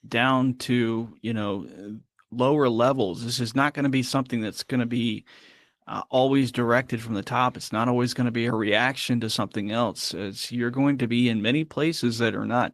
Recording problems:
garbled, watery; slightly; nothing above 13.5 kHz

